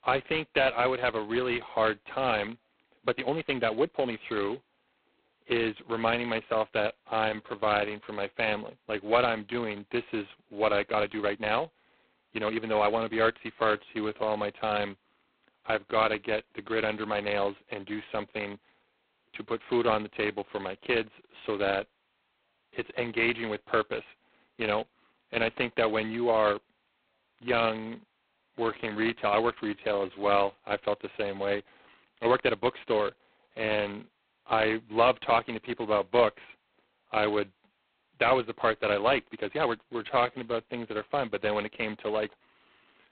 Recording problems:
phone-call audio; poor line; nothing above 4 kHz
uneven, jittery; strongly; from 3 to 41 s

